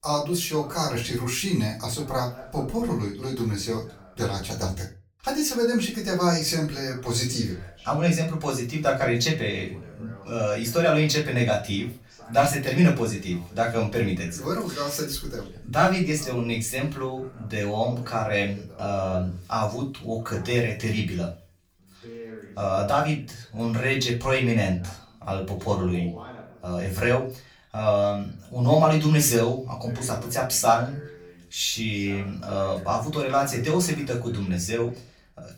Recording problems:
off-mic speech; far
room echo; slight; dies away in 0.3 s
voice in the background; faint; throughout; 20 dB below the speech

